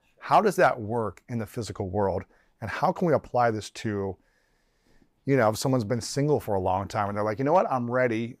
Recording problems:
none

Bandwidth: 15 kHz